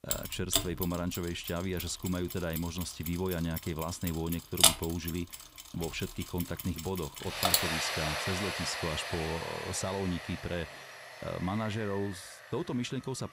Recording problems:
machinery noise; very loud; throughout; 3 dB above the speech

